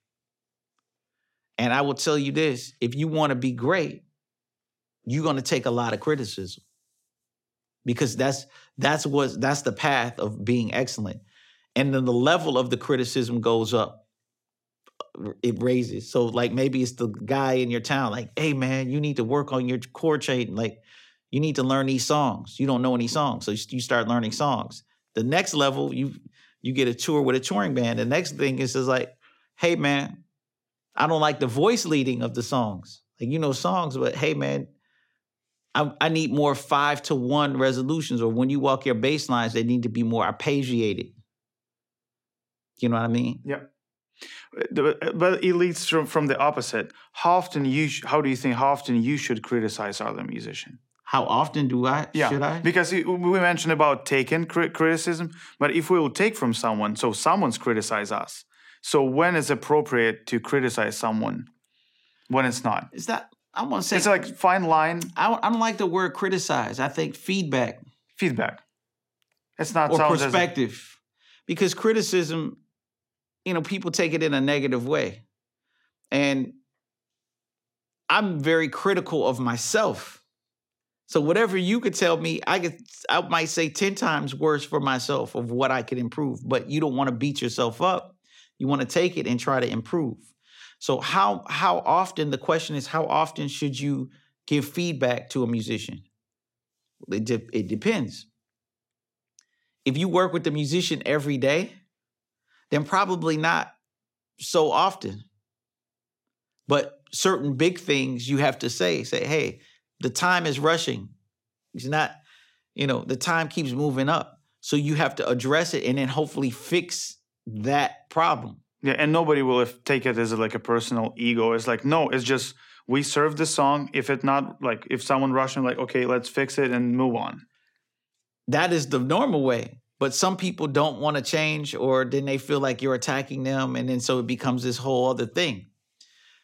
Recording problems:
none

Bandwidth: 16.5 kHz